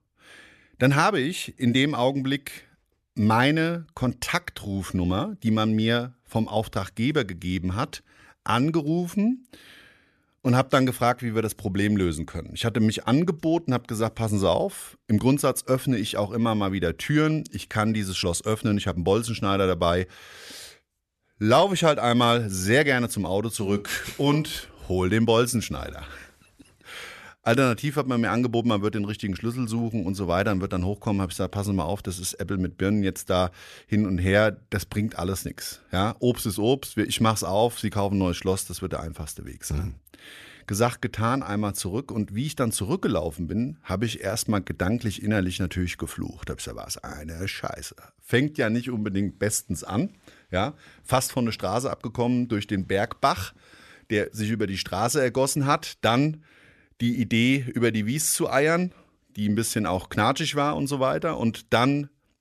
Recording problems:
none

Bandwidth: 13.5 kHz